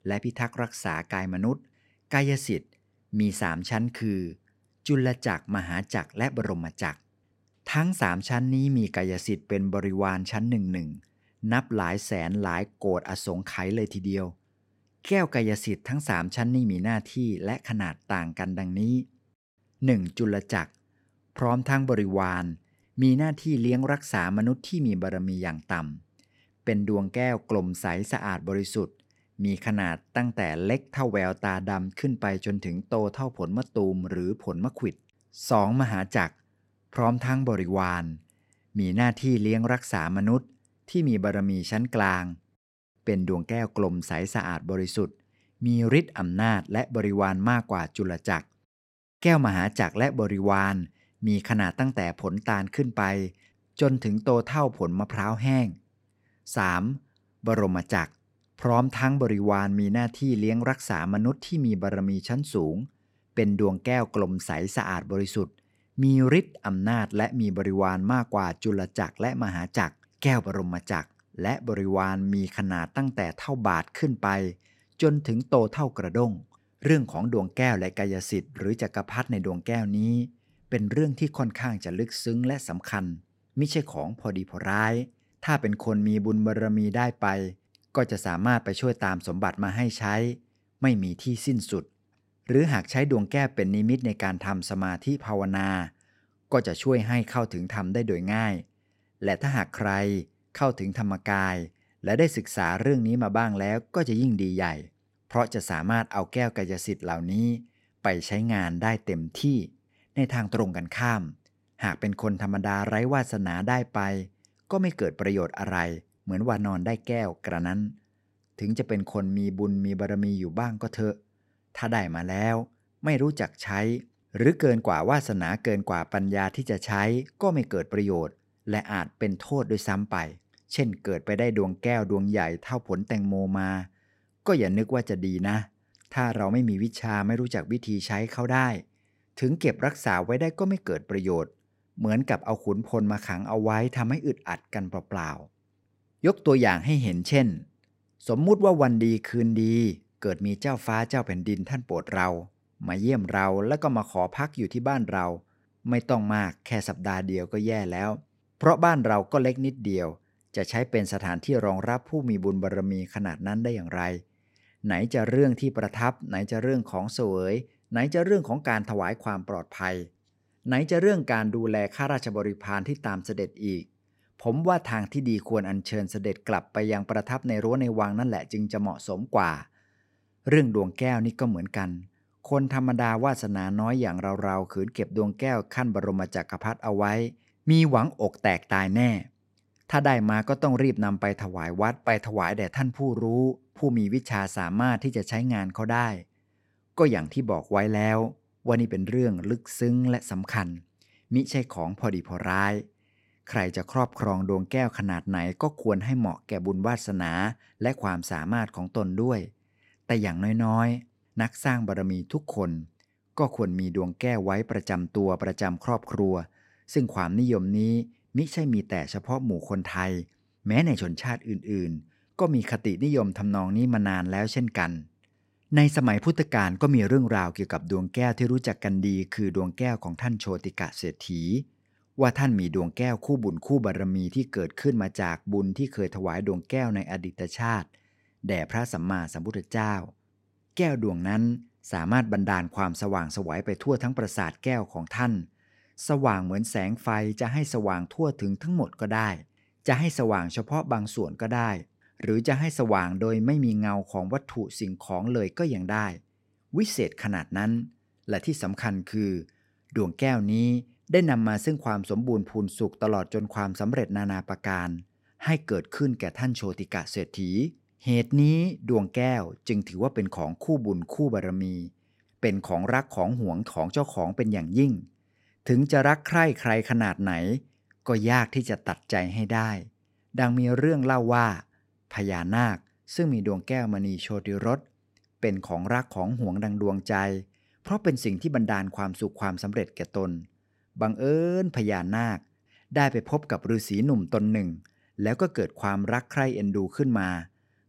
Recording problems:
none

